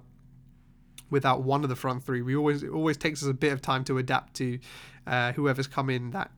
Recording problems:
none

